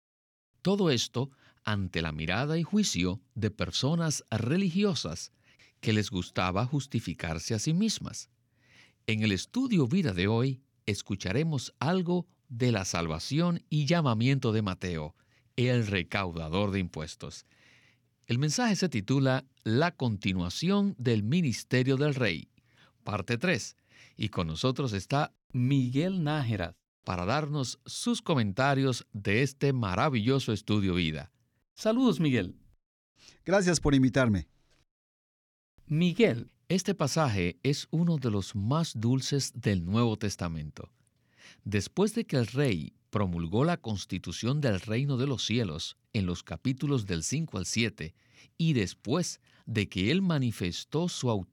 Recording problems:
none

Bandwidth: 18.5 kHz